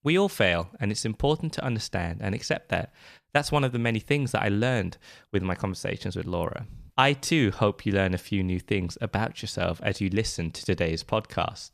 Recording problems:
none

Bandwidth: 14.5 kHz